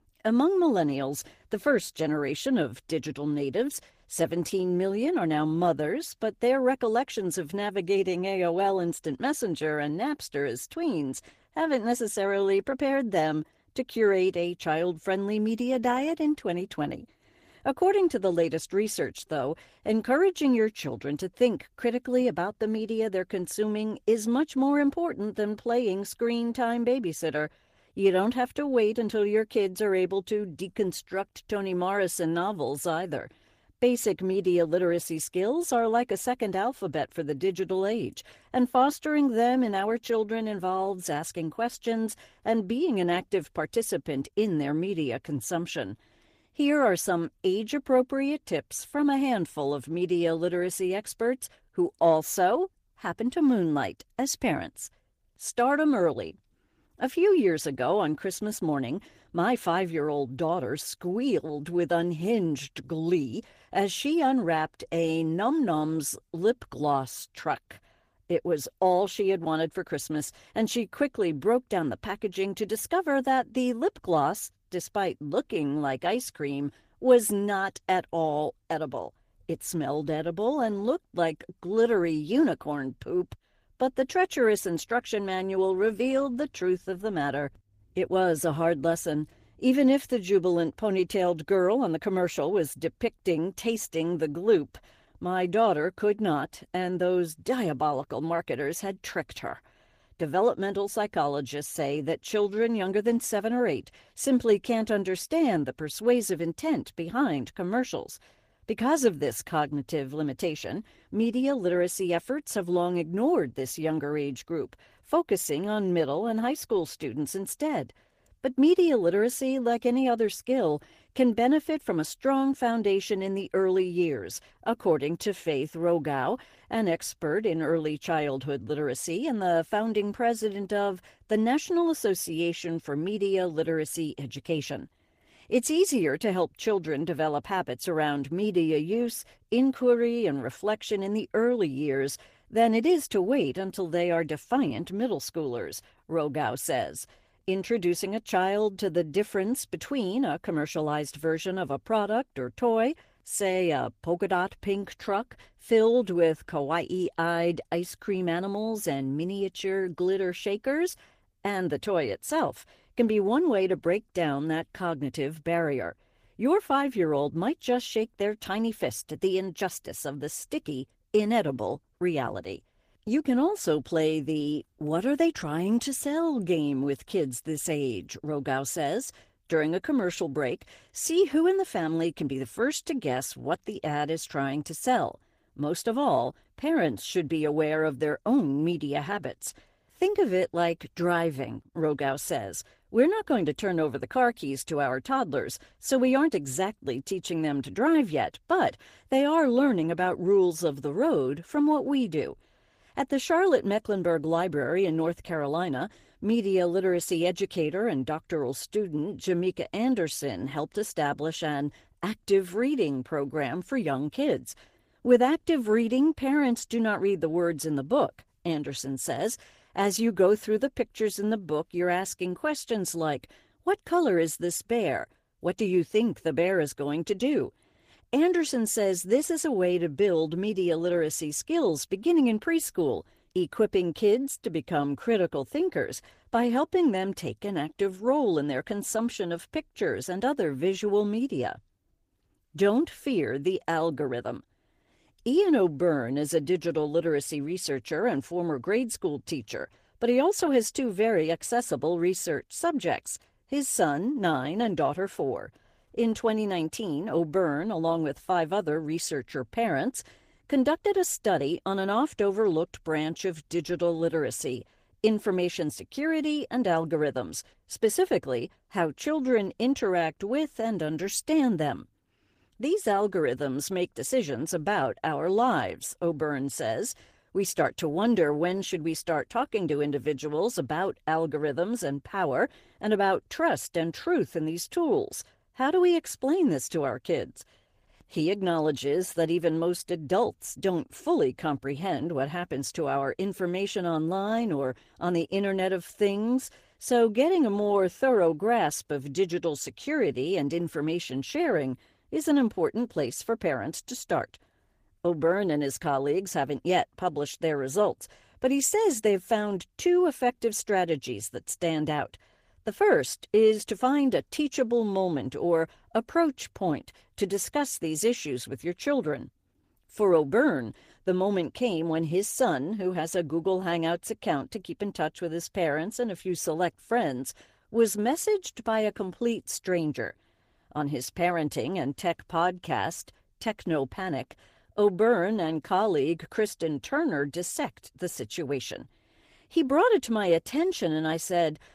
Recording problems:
garbled, watery; slightly; nothing above 15 kHz

